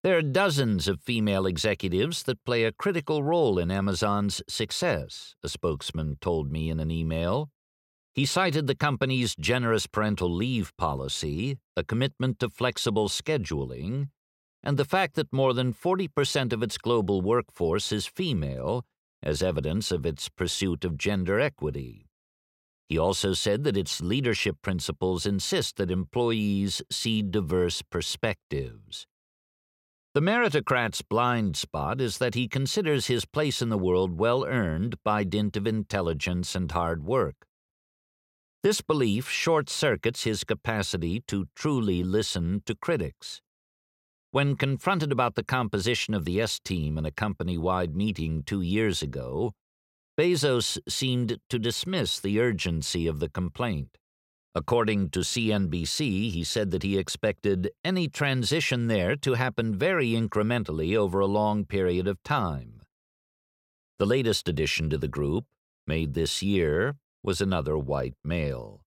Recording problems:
none

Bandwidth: 16.5 kHz